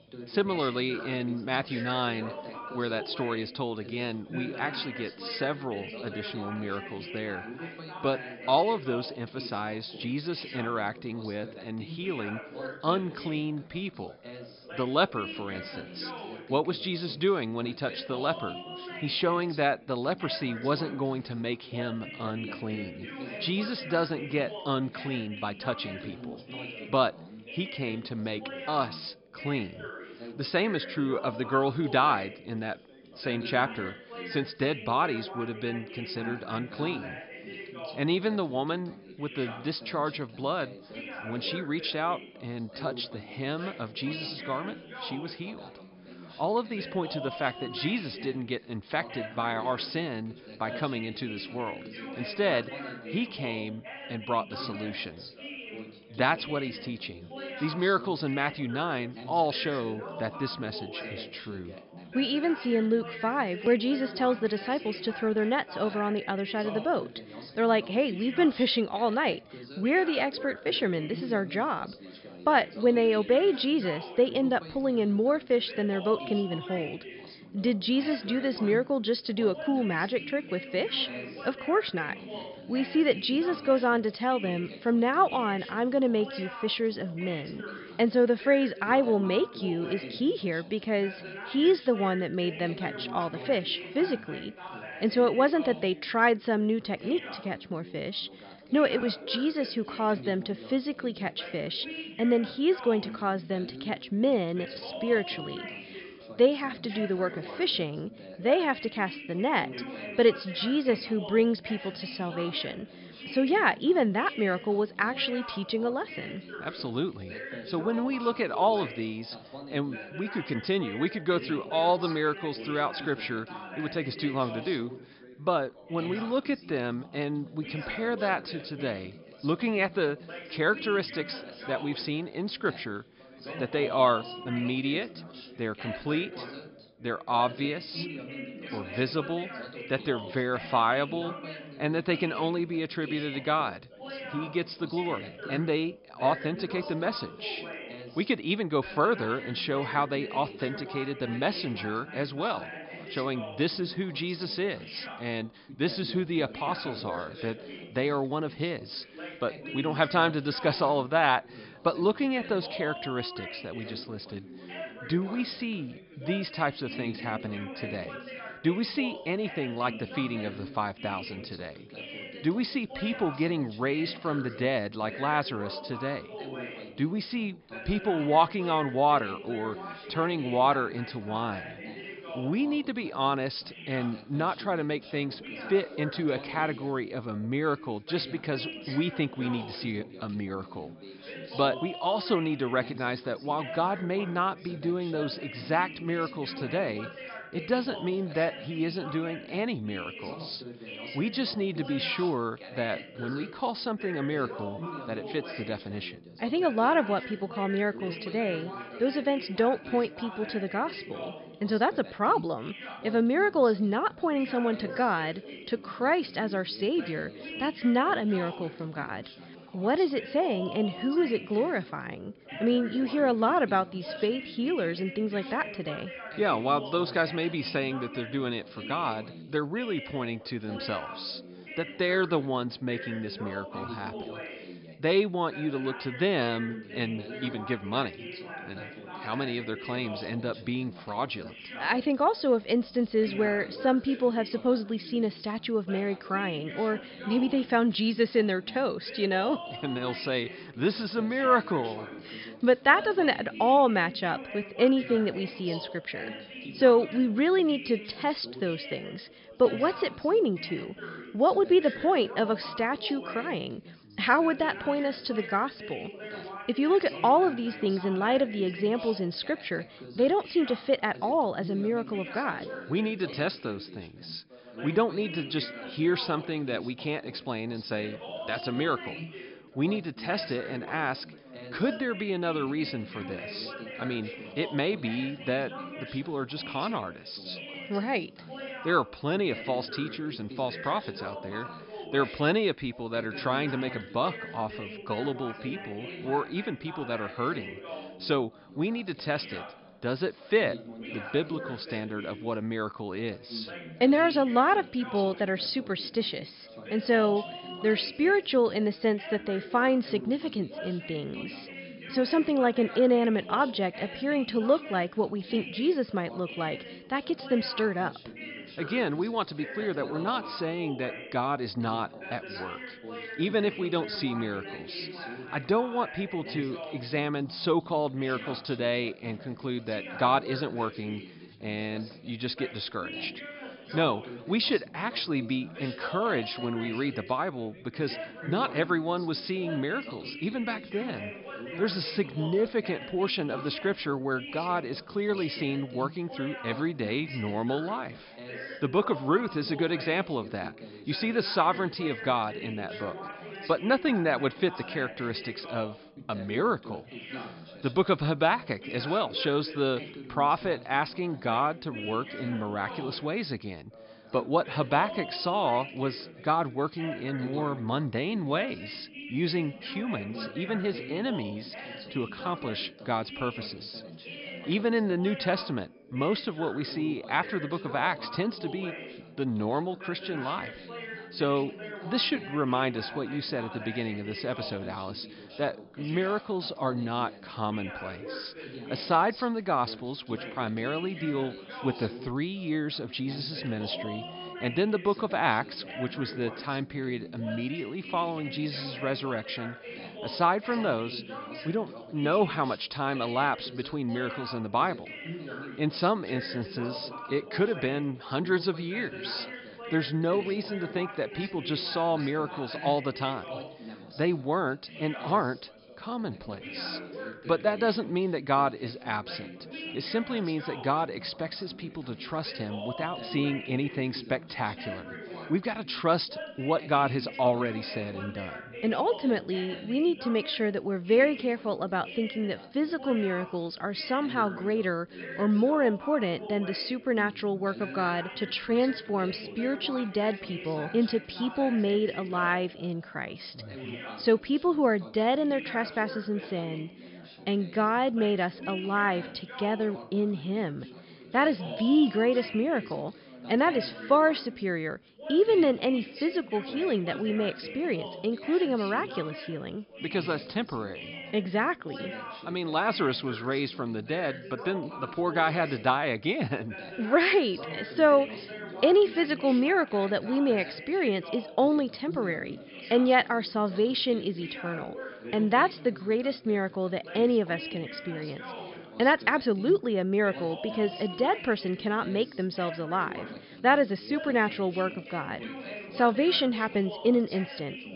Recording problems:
high frequencies cut off; noticeable; nothing above 5.5 kHz
background chatter; noticeable; throughout; 3 voices, 10 dB below the speech

